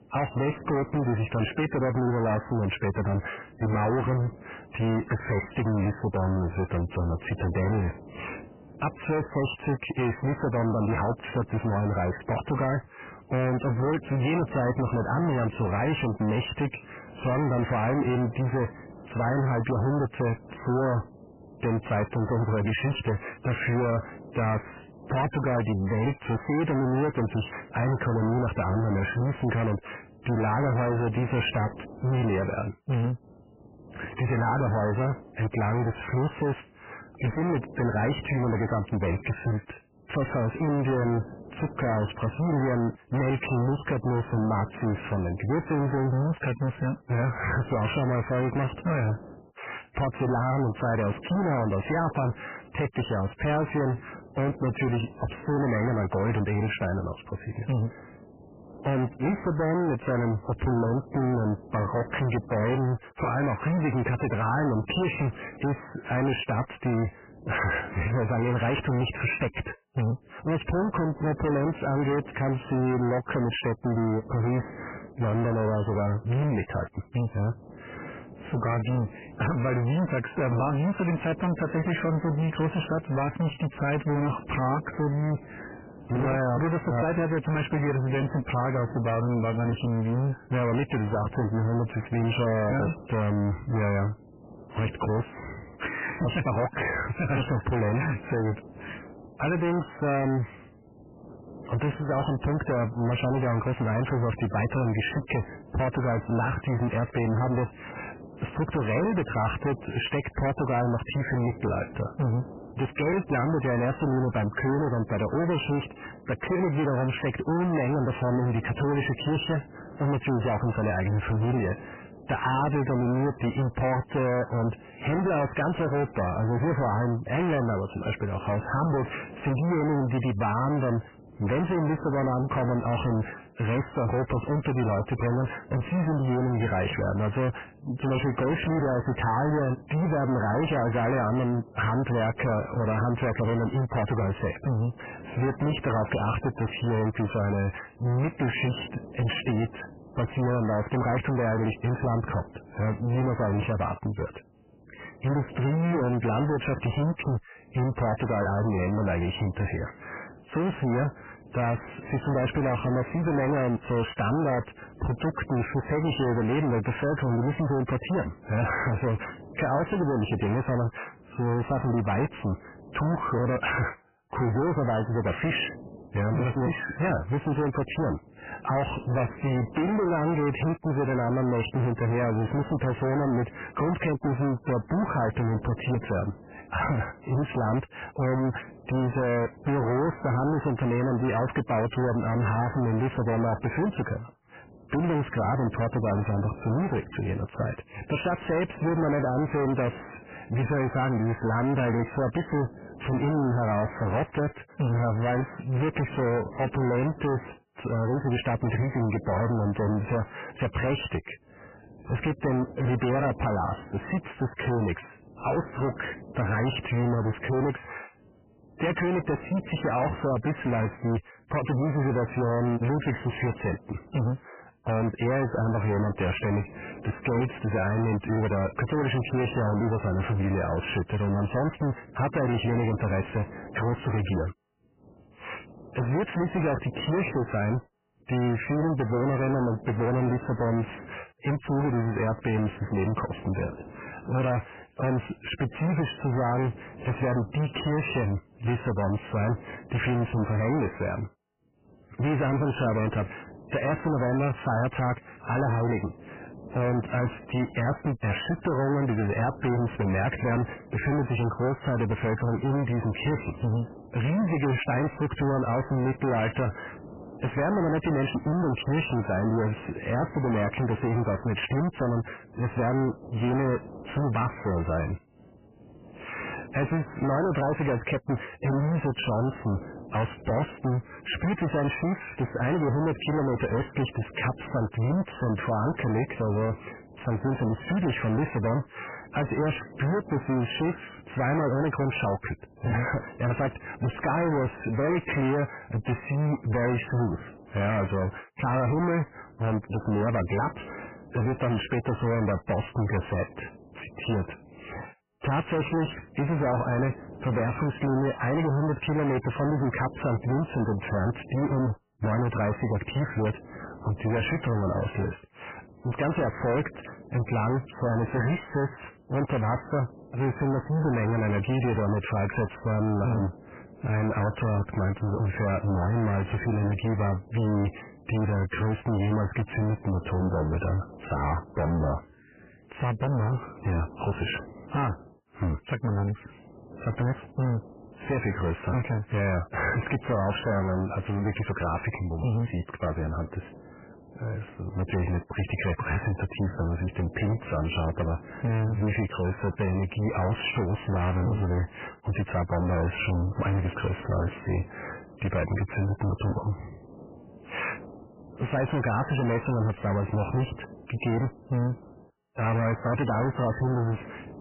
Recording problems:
distortion; heavy; 6 dB below the speech
garbled, watery; badly; nothing above 3 kHz
hiss; noticeable; throughout; 20 dB below the speech

